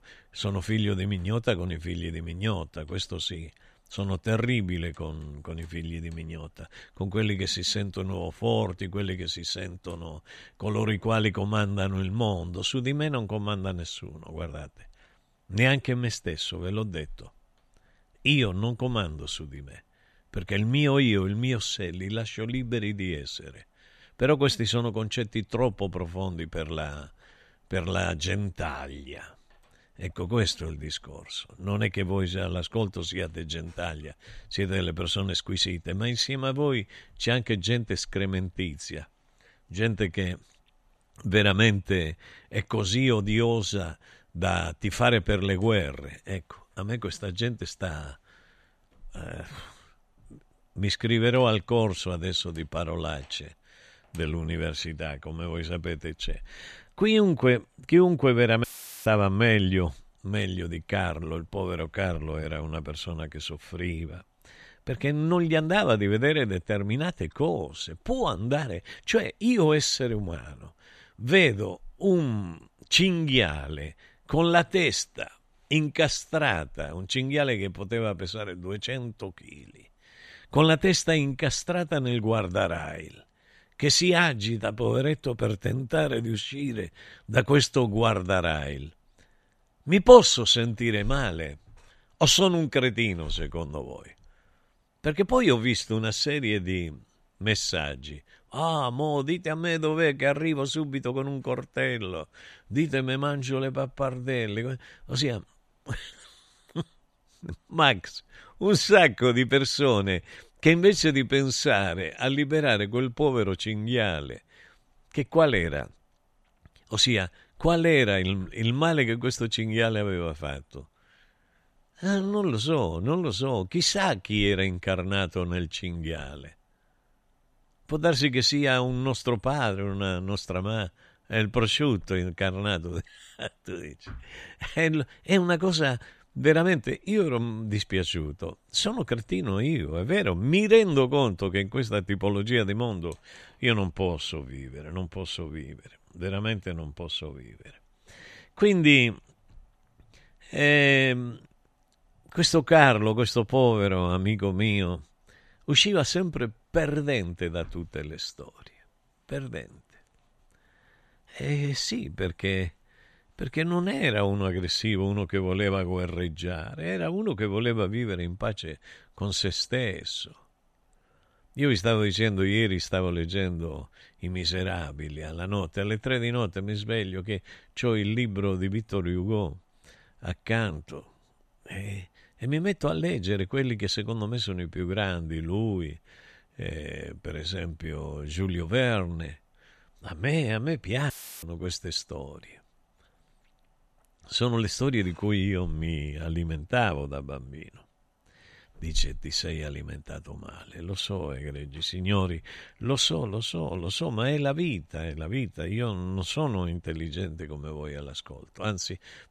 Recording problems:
audio cutting out; filled with static; at 59 s and at 3:11

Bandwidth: 14 kHz